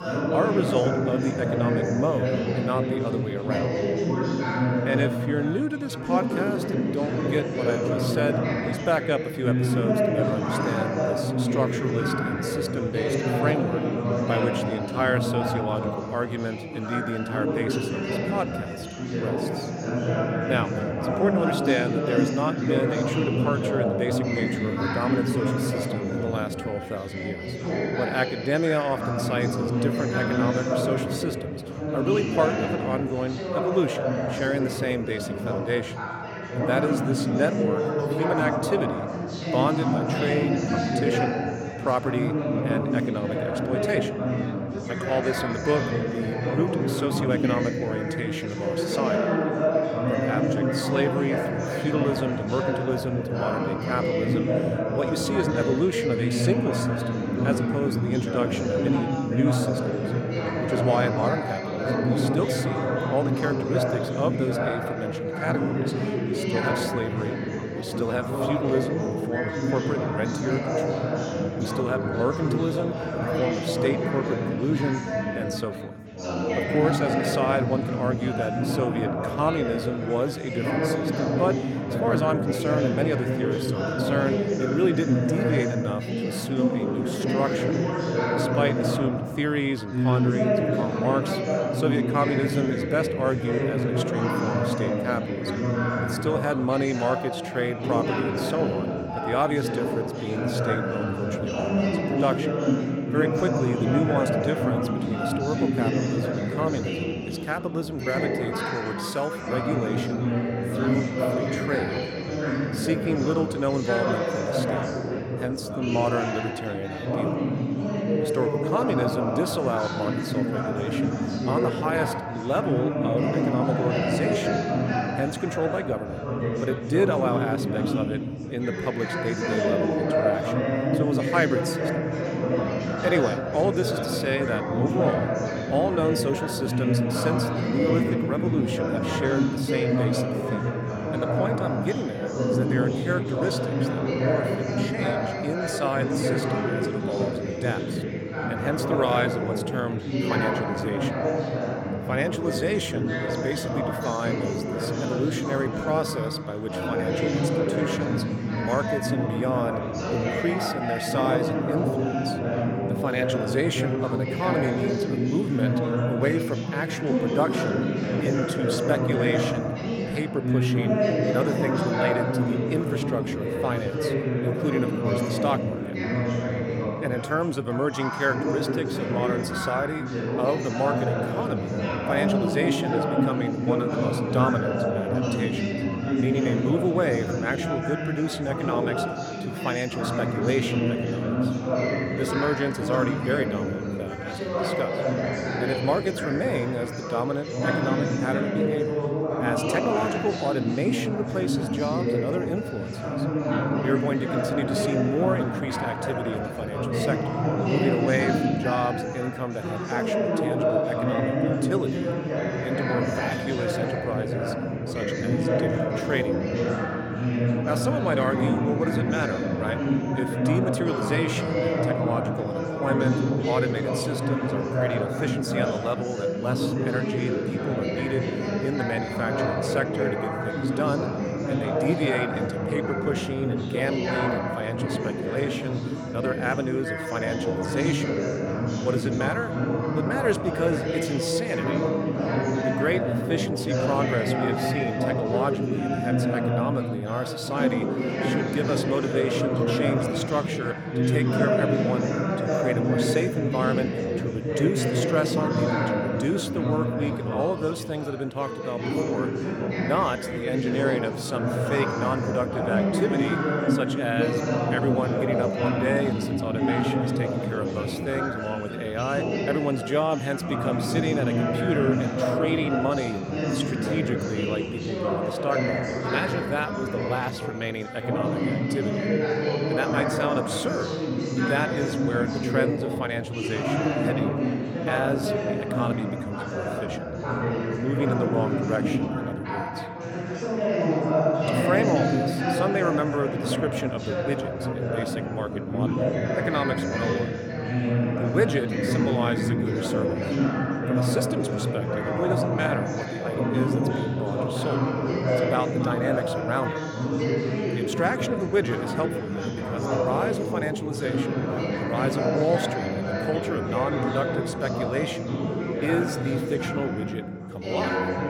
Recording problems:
chatter from many people; very loud; throughout; 3 dB above the speech

